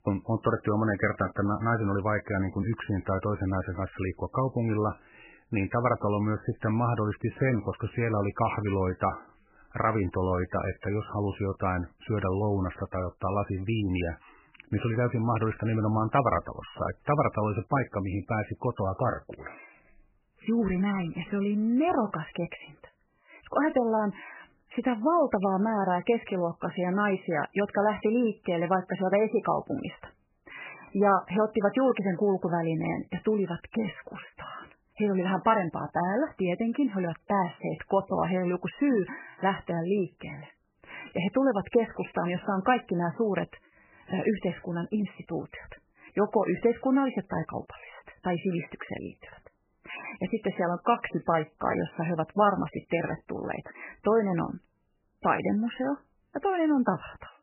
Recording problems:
garbled, watery; badly; nothing above 3 kHz

